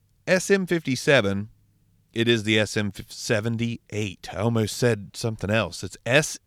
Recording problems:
none

